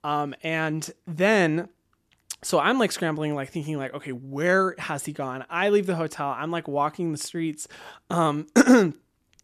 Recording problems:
none

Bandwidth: 14 kHz